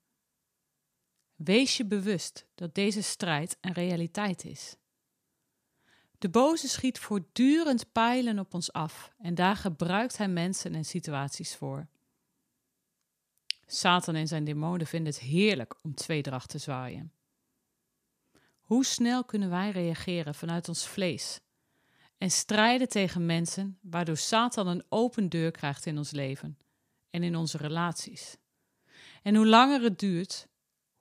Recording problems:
none

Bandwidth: 14.5 kHz